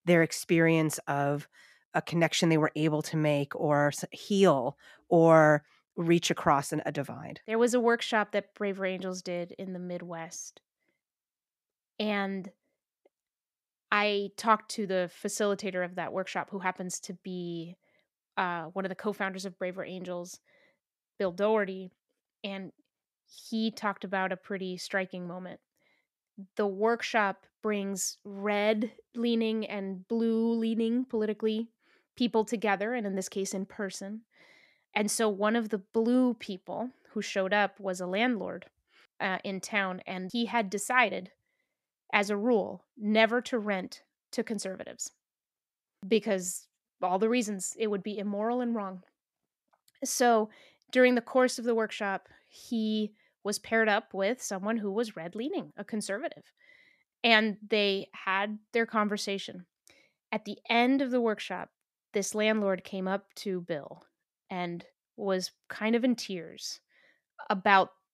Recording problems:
none

